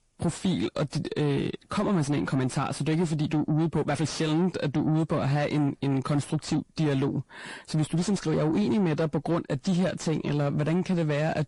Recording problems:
distortion; slight; 10 dB below the speech
garbled, watery; slightly; nothing above 10.5 kHz

